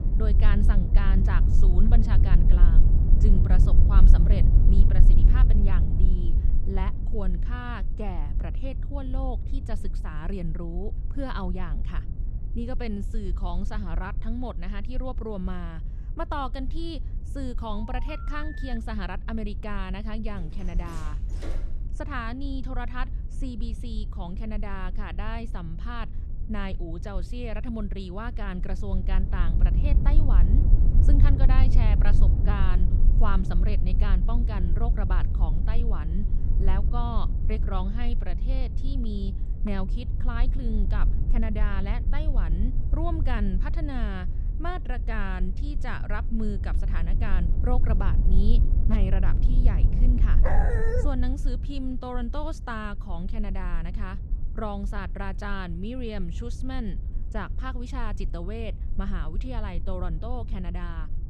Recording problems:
low rumble; loud; throughout; 7 dB below the speech
phone ringing; noticeable; from 18 to 19 s; peak 8 dB below the speech
door banging; noticeable; from 20 to 22 s; peak 7 dB below the speech
dog barking; loud; at 50 s; peak 4 dB above the speech

